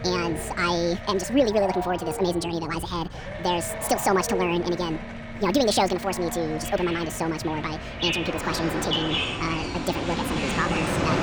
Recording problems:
wrong speed and pitch; too fast and too high; 1.7 times normal speed
animal sounds; loud; throughout; 7 dB below the speech
train or aircraft noise; loud; throughout; 4 dB below the speech
low rumble; noticeable; throughout; 10 dB below the speech

